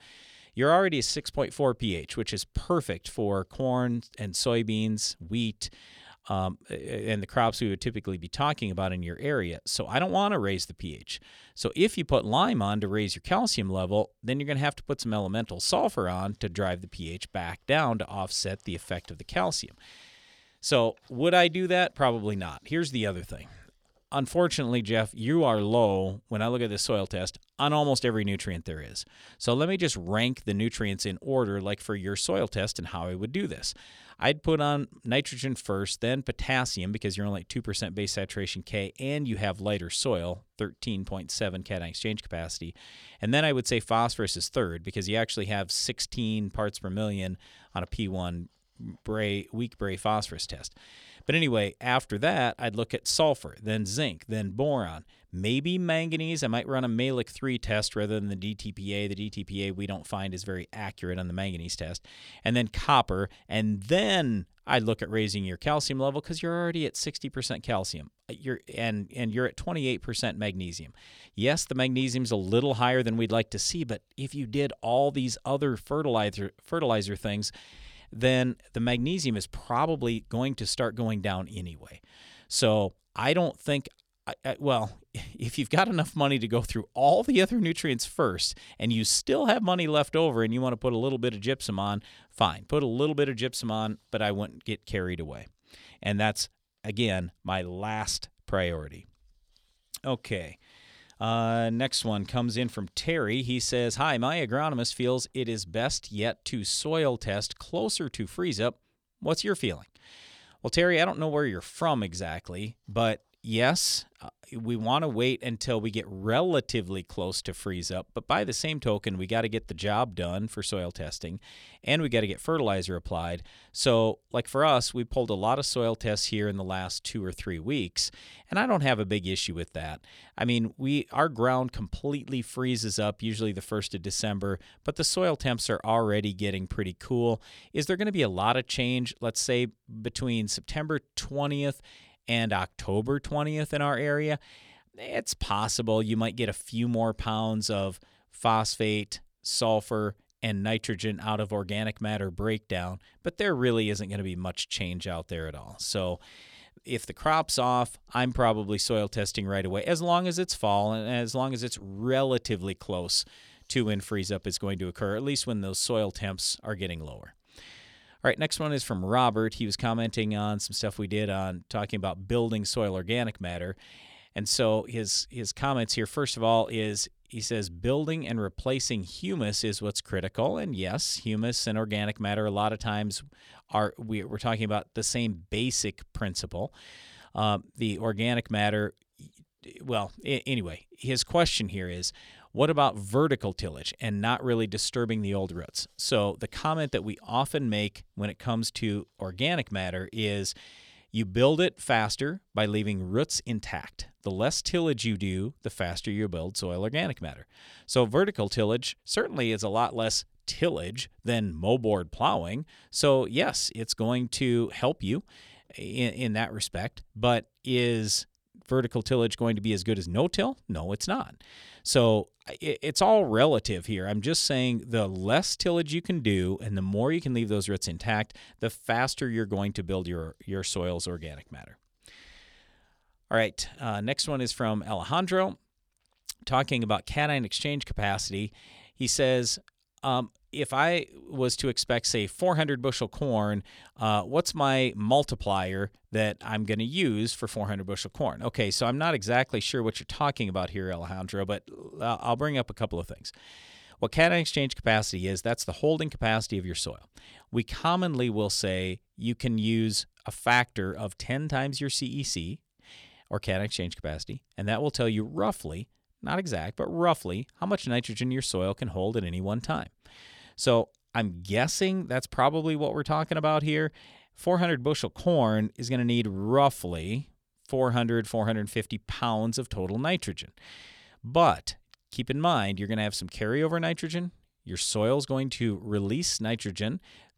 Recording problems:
none

